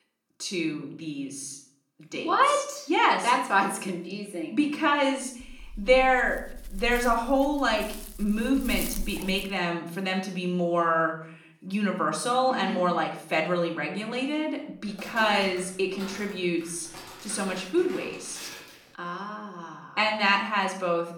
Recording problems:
off-mic speech; far
room echo; slight; dies away in 0.6 s
dog barking; noticeable; from 5.5 to 9.5 s; peak 6 dB below the speech
footsteps; faint; from 15 to 19 s; peak 15 dB below the speech

